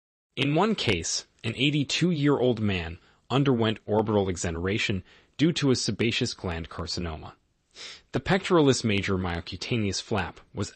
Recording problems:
none

